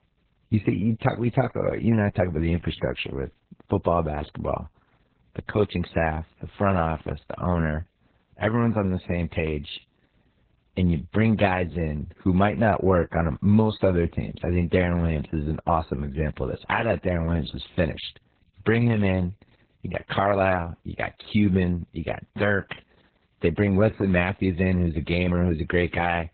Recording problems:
garbled, watery; badly; nothing above 4 kHz

